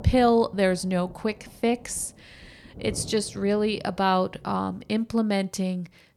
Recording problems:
rain or running water; noticeable; throughout; 20 dB below the speech

